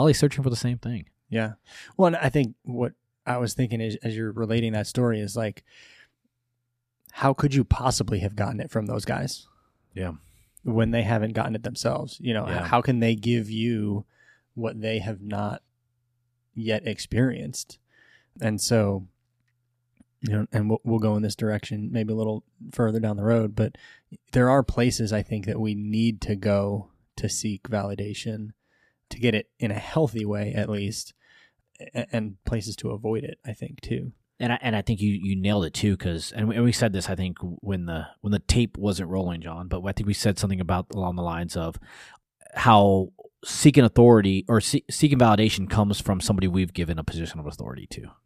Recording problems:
abrupt cut into speech; at the start

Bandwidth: 14.5 kHz